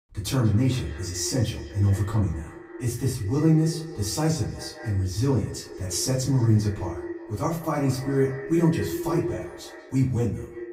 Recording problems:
echo of what is said; strong; throughout; 180 ms later, 10 dB below the speech
off-mic speech; far
room echo; slight; dies away in 0.3 s

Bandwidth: 15.5 kHz